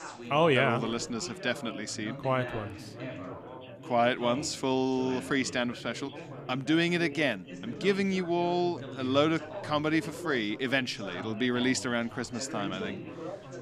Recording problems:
background chatter; noticeable; throughout; 4 voices, 10 dB below the speech

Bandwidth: 15 kHz